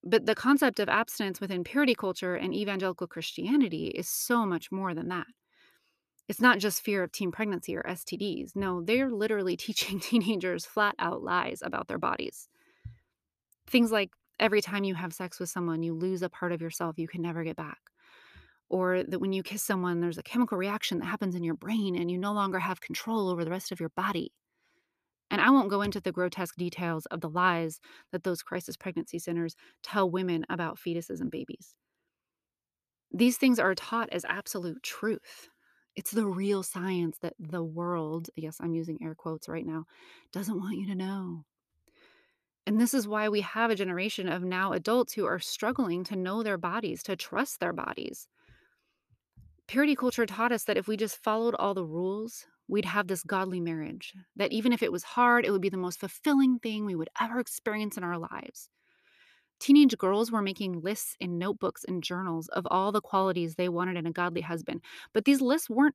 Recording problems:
none

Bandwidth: 14.5 kHz